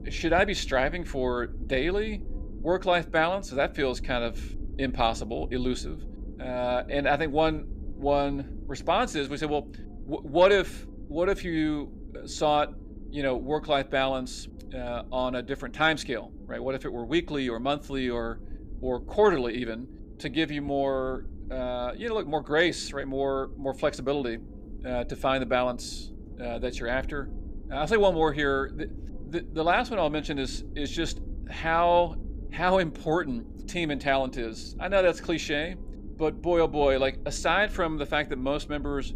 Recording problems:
low rumble; faint; throughout; 25 dB below the speech

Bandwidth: 15 kHz